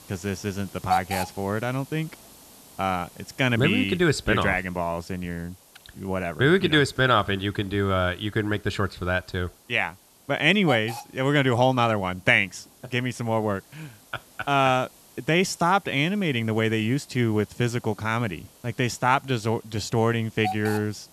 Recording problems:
hiss; noticeable; throughout; 15 dB below the speech

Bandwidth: 13.5 kHz